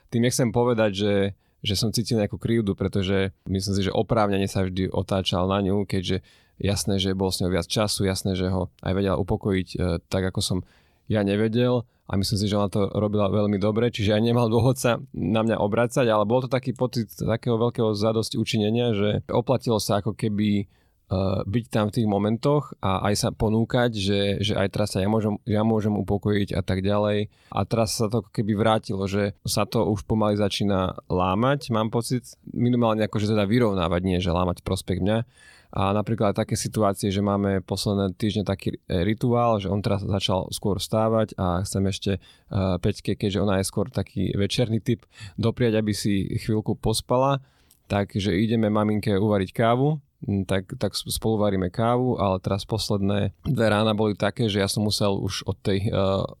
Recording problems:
none

